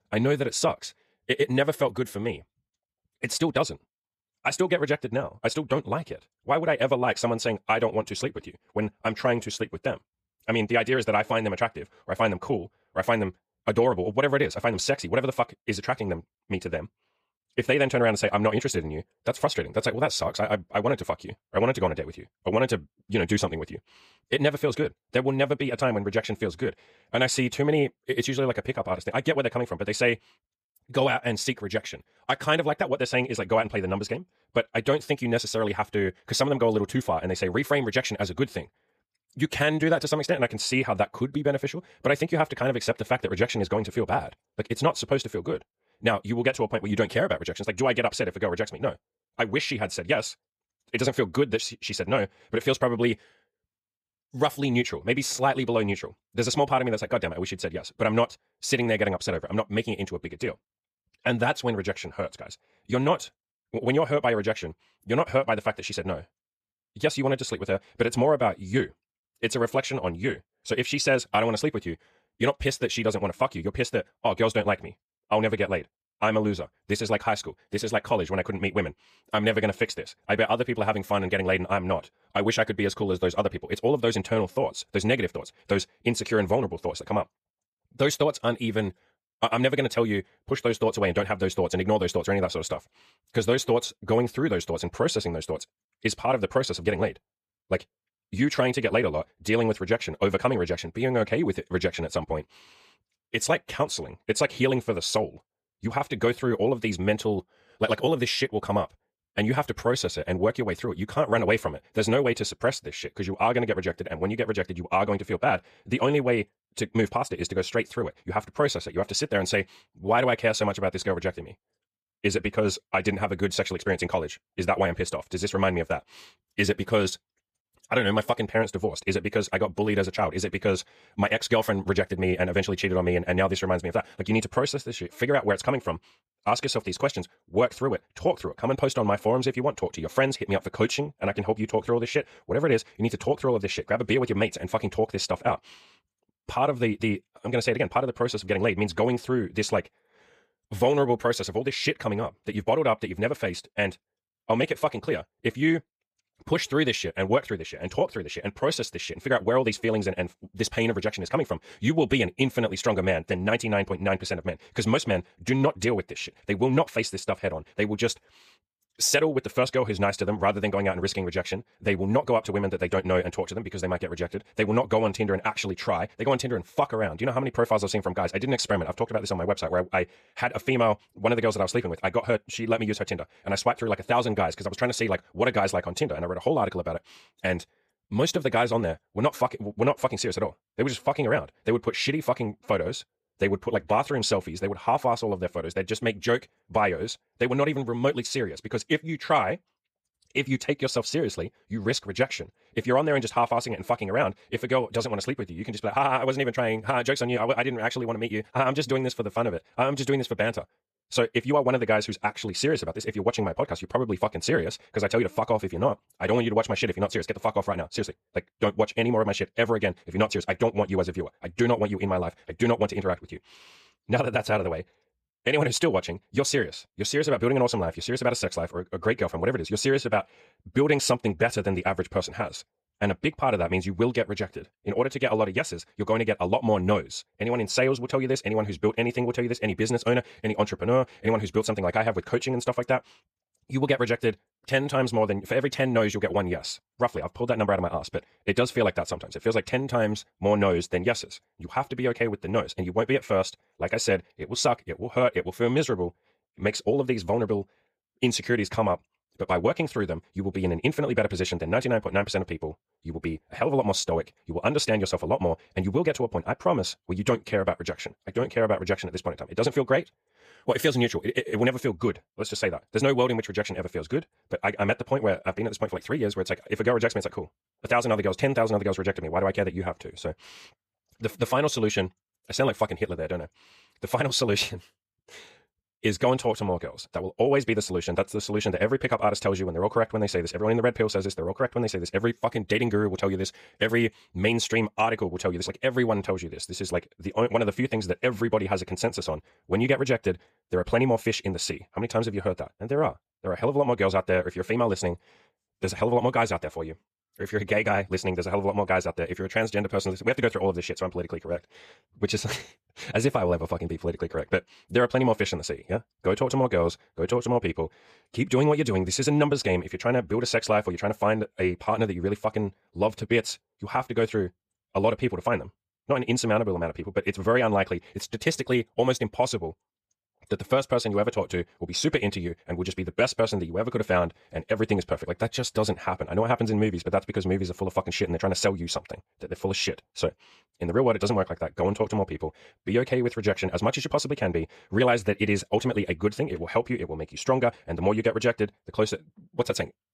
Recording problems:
wrong speed, natural pitch; too fast; 1.5 times normal speed

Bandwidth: 15 kHz